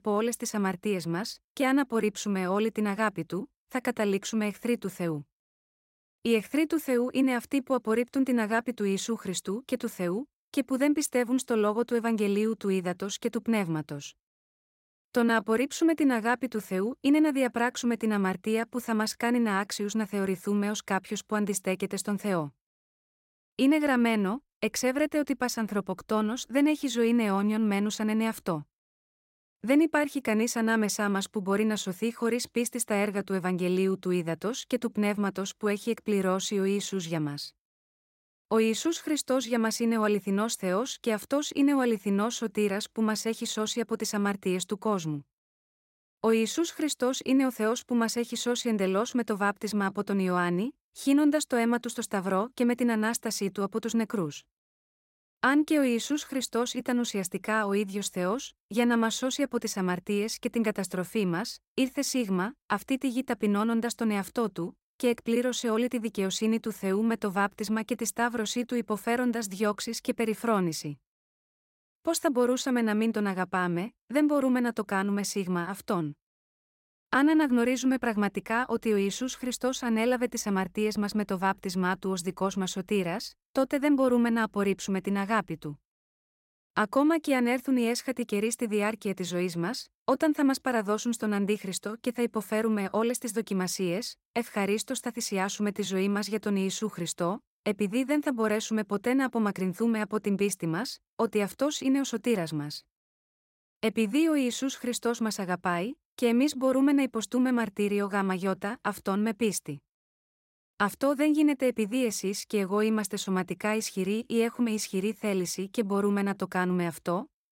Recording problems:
none

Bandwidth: 16 kHz